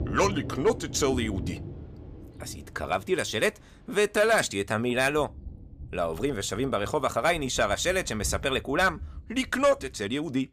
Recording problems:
rain or running water; noticeable; throughout; 15 dB below the speech

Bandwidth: 14.5 kHz